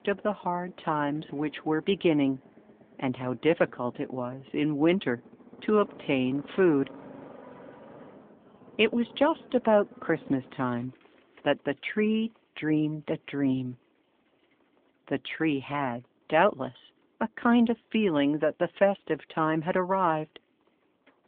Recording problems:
phone-call audio
traffic noise; faint; throughout; 25 dB below the speech

